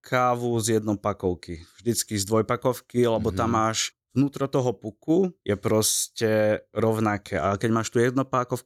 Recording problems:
none

